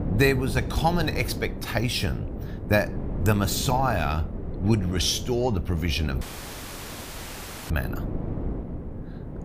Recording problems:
wind noise on the microphone; occasional gusts; 15 dB below the speech
audio cutting out; at 6 s for 1.5 s

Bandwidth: 15 kHz